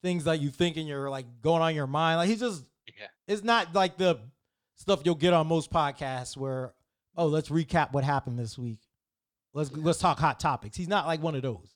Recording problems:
none

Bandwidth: 18 kHz